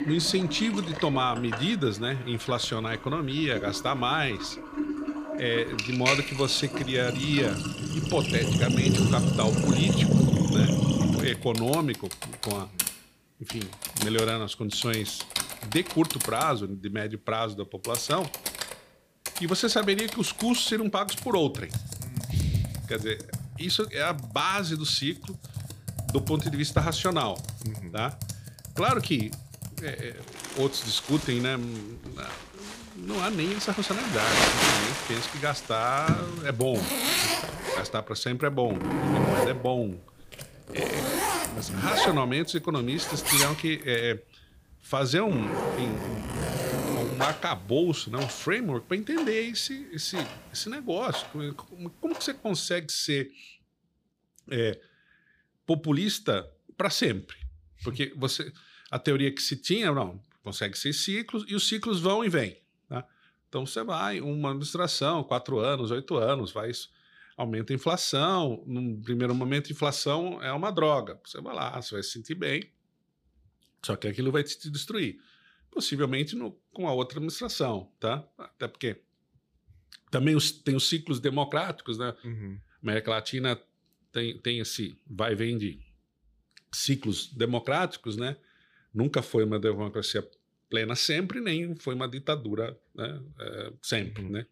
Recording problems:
household noises; loud; until 53 s; 1 dB below the speech

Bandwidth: 15 kHz